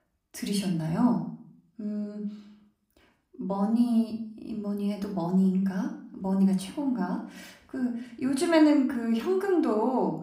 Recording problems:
room echo; slight; dies away in 0.4 s
off-mic speech; somewhat distant

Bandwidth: 15.5 kHz